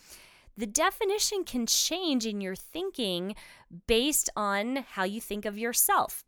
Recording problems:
none

